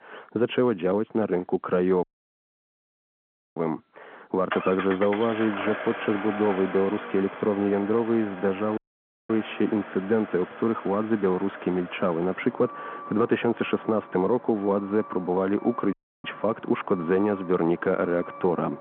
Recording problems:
muffled; very; fading above 1.5 kHz
phone-call audio
traffic noise; noticeable; throughout; 10 dB below the speech
audio cutting out; at 2 s for 1.5 s, at 9 s for 0.5 s and at 16 s

